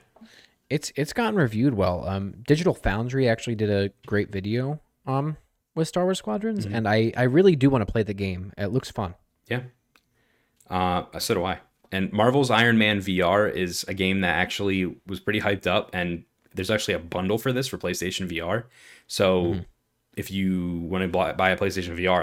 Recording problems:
abrupt cut into speech; at the end

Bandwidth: 16.5 kHz